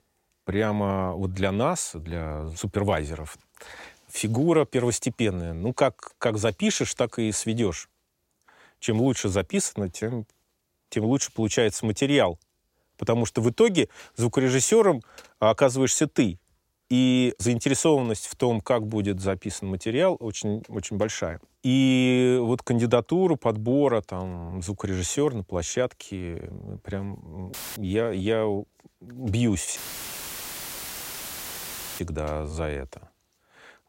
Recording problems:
audio cutting out; filled with static; at 28 s and at 30 s for 2 s

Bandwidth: 16 kHz